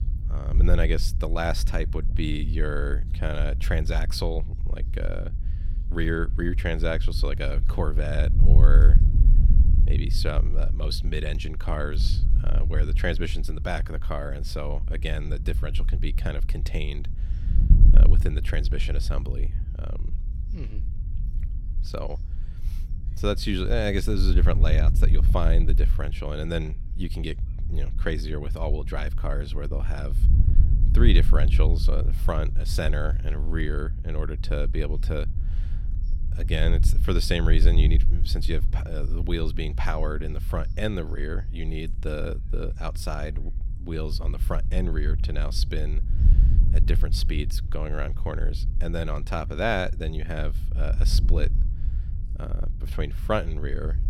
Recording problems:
wind noise on the microphone; occasional gusts; 10 dB below the speech

